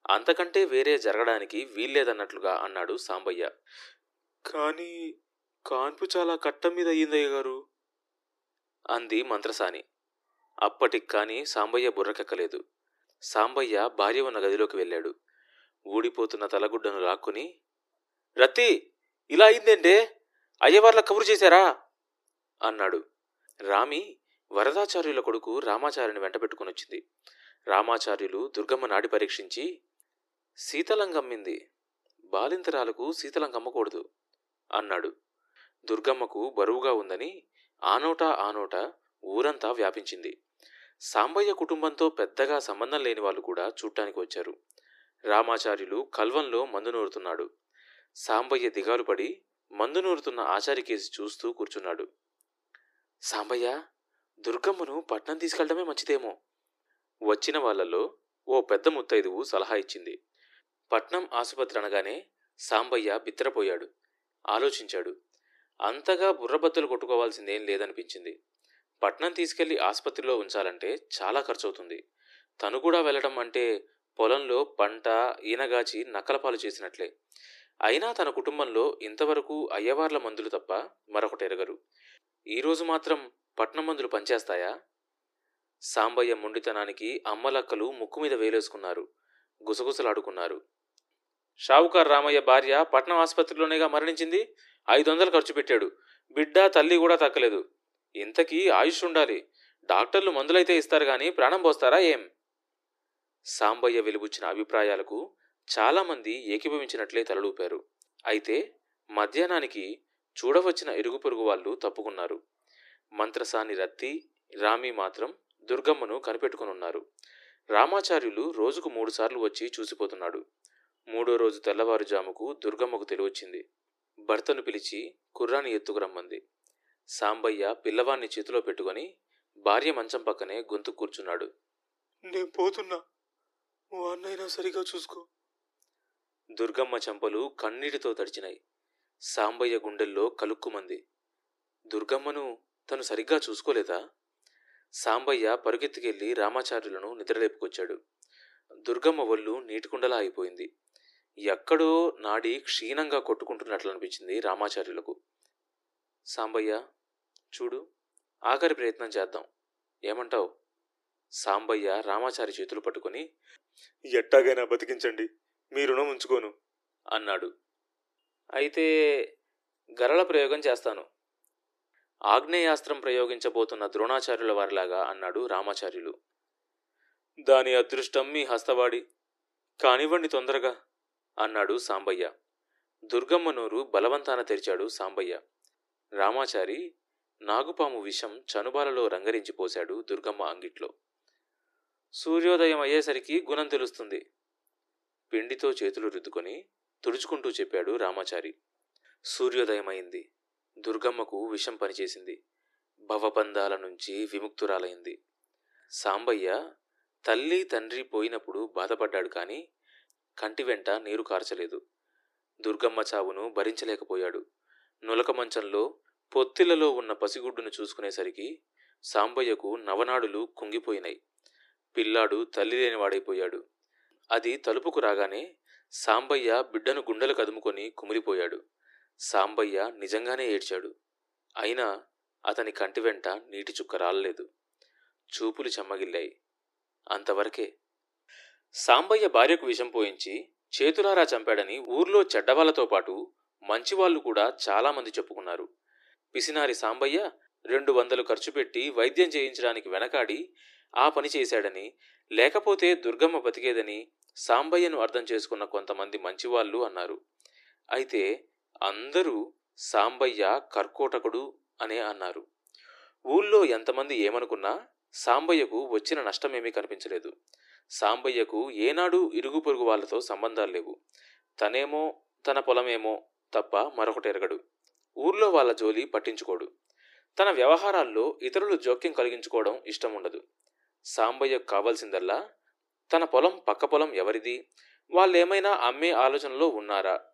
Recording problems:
thin; very; fading below 300 Hz

